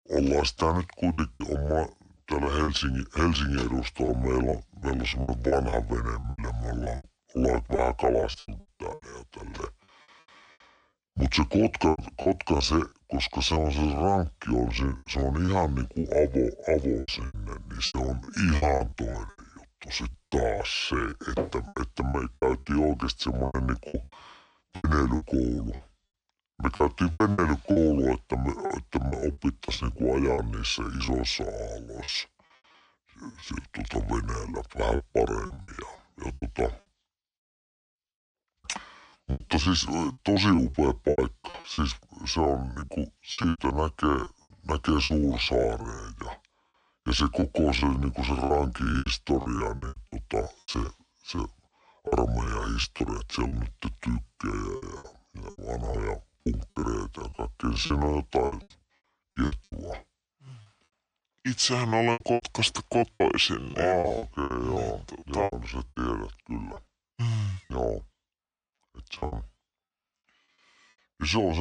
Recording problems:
wrong speed and pitch; too slow and too low; 0.6 times normal speed
choppy; very; 12% of the speech affected
abrupt cut into speech; at the end

